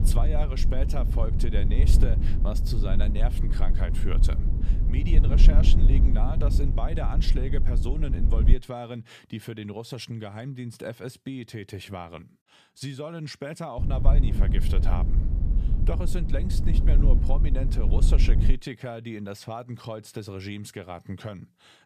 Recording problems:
low rumble; loud; until 8.5 s and from 14 to 19 s; 4 dB below the speech

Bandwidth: 14.5 kHz